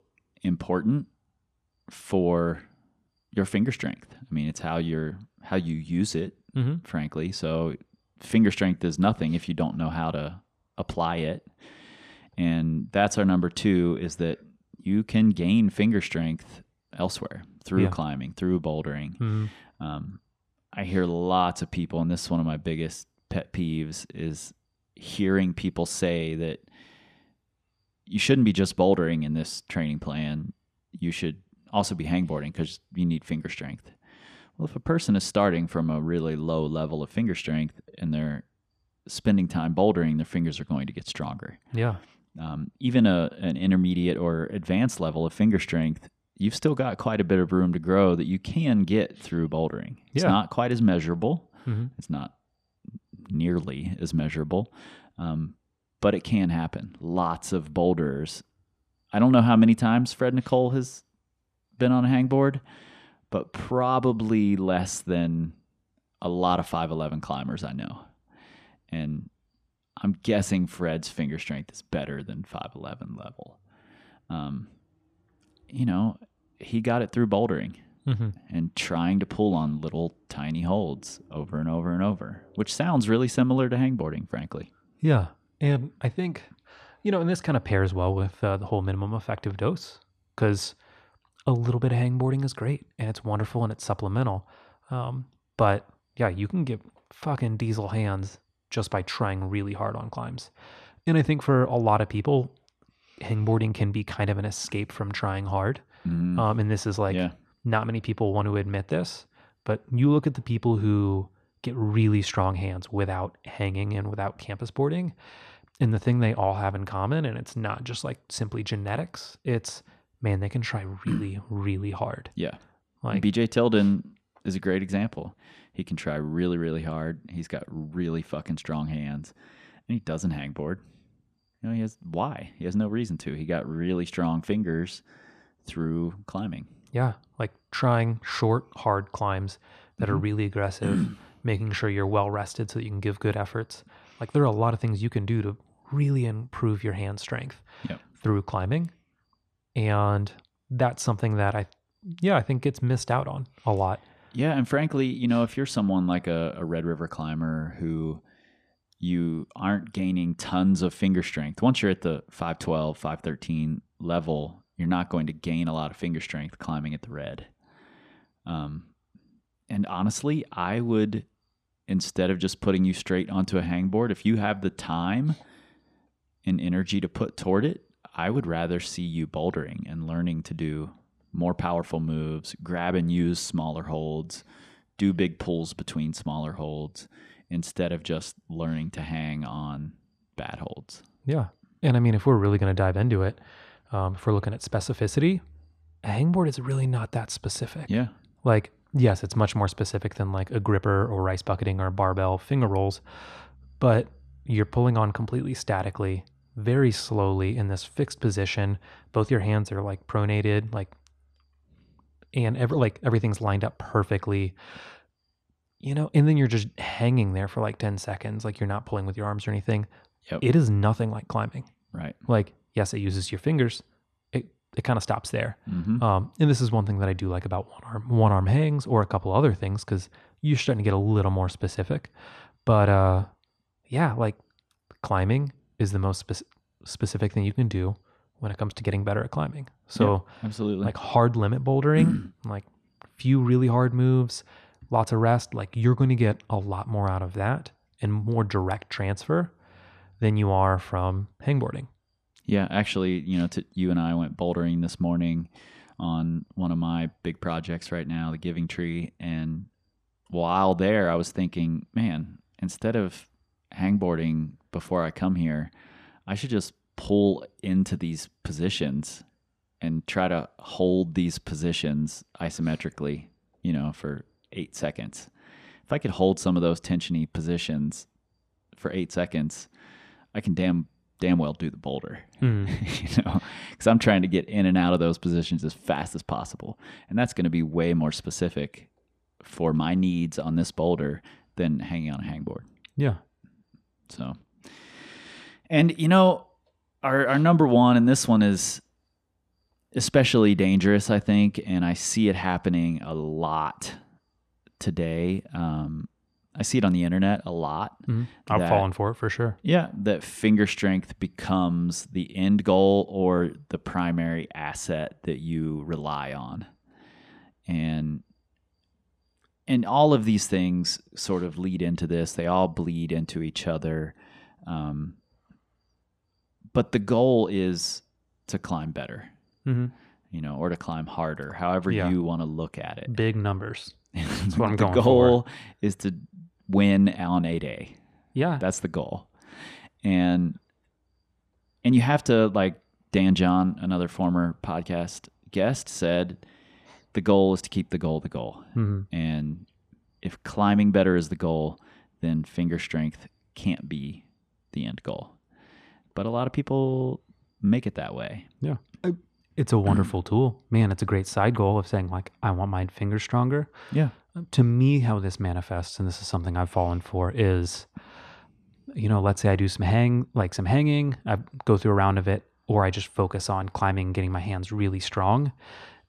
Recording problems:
none

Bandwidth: 14.5 kHz